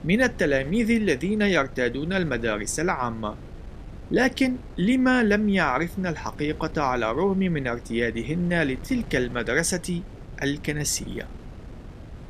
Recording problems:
wind noise on the microphone; occasional gusts; 20 dB below the speech

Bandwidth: 14 kHz